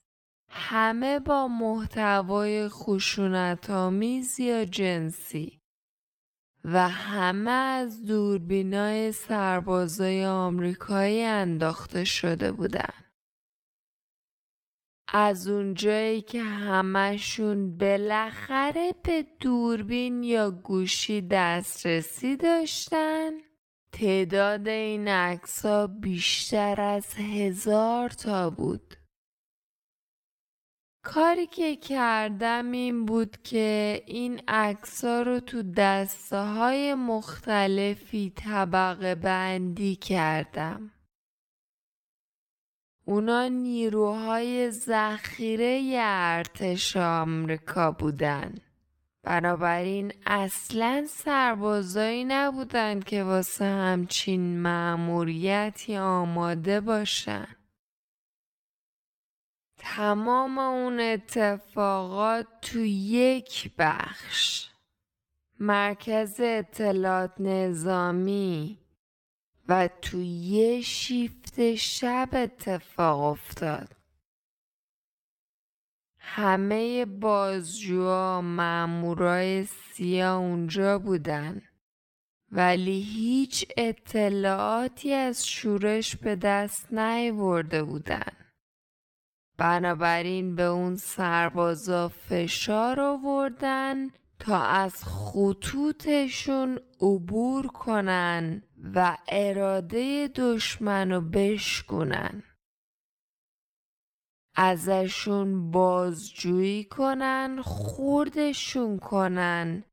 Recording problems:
wrong speed, natural pitch; too slow; 0.5 times normal speed

